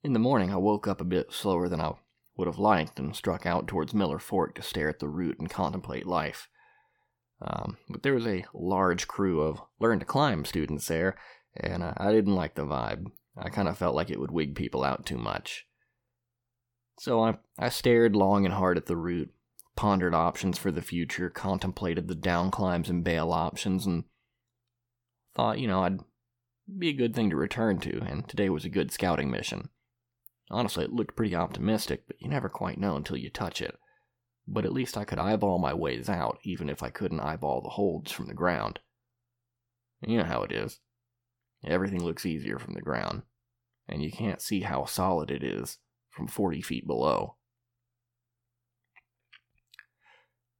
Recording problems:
none

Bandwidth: 17.5 kHz